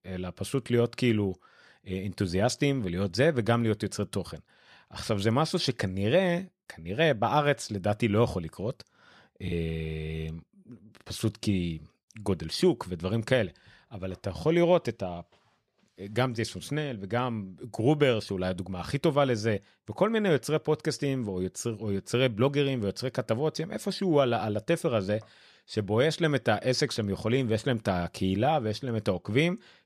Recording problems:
choppy; occasionally; at 9.5 s; 1% of the speech affected

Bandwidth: 14.5 kHz